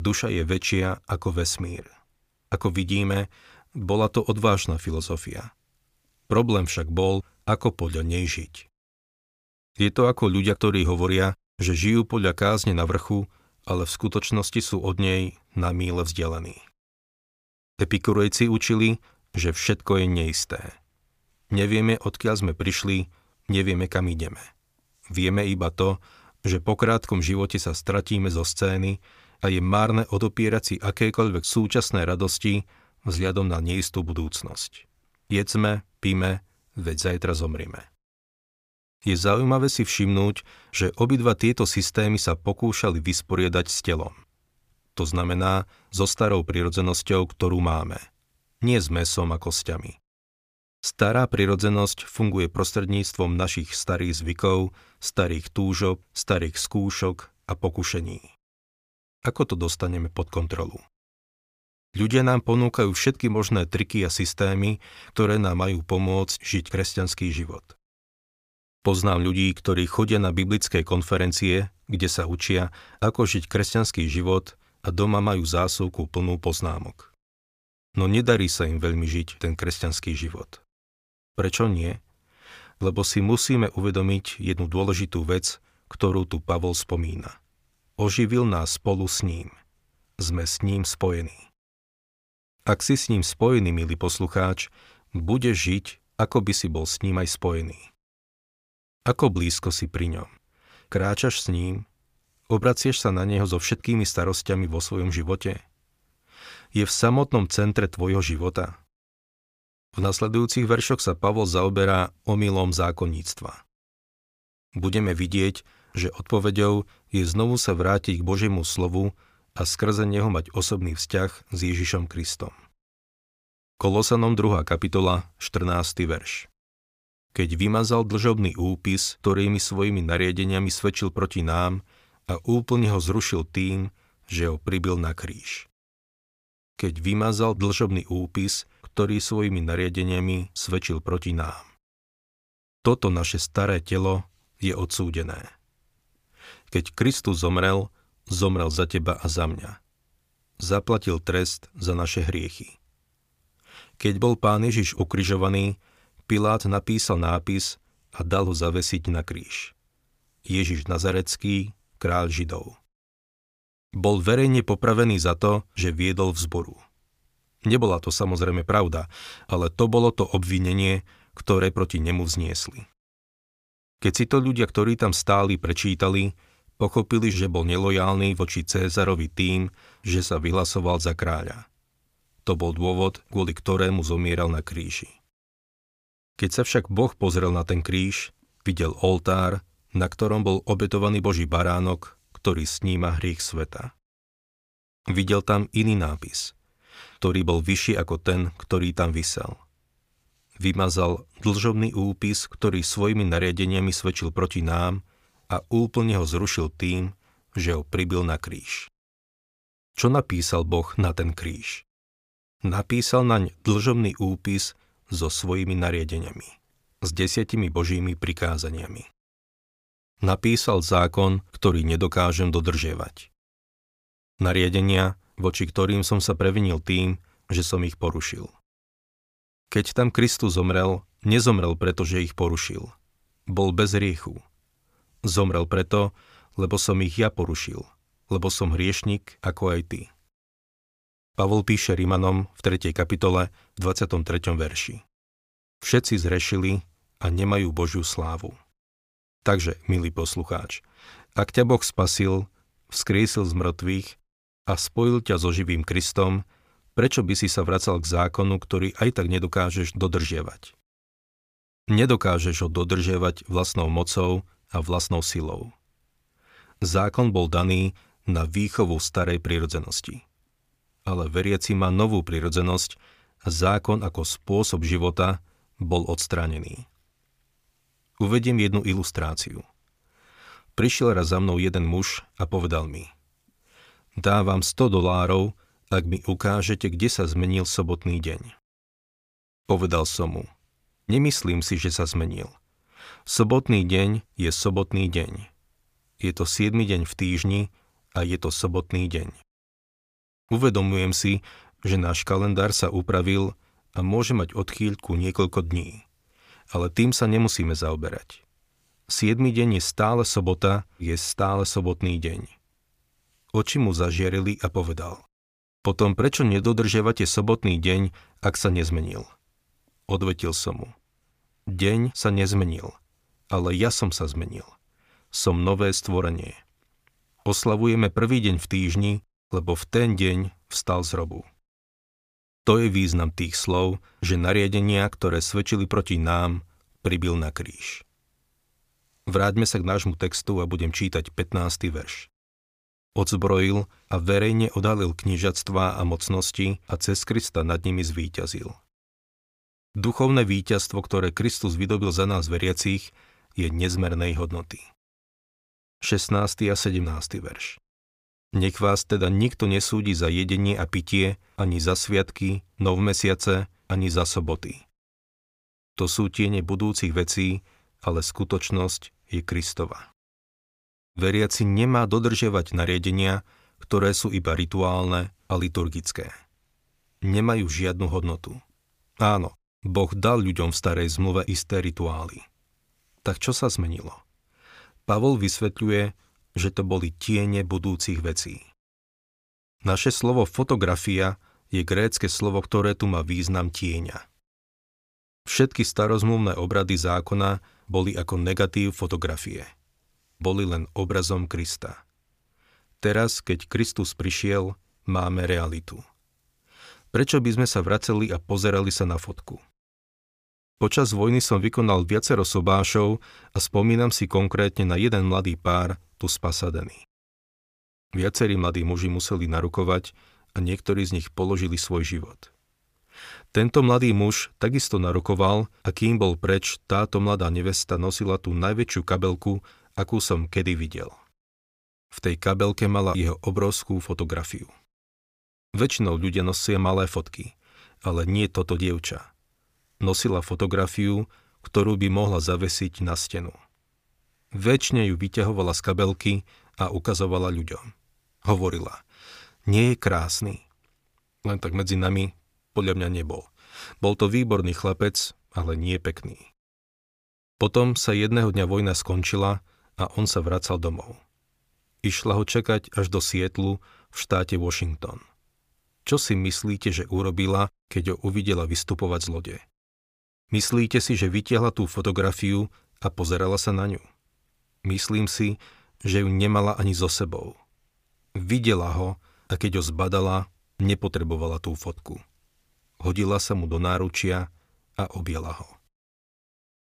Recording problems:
abrupt cut into speech; at the start

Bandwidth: 15 kHz